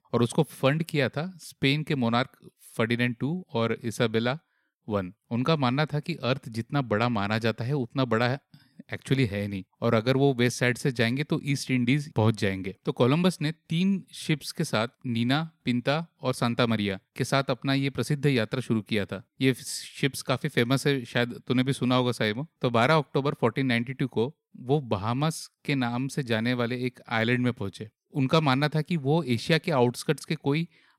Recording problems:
none

